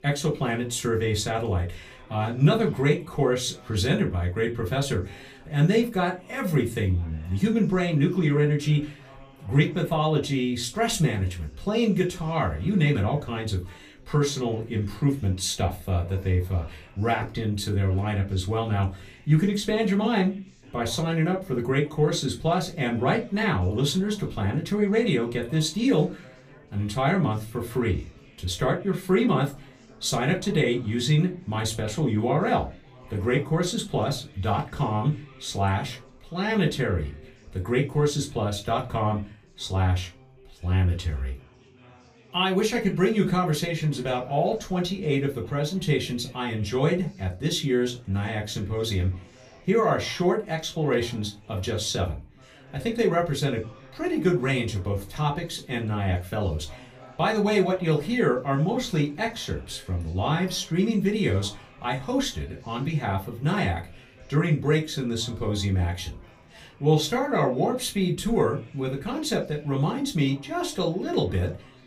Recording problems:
off-mic speech; far
room echo; very slight; dies away in 0.2 s
background chatter; faint; throughout; 4 voices, 25 dB below the speech

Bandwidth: 15 kHz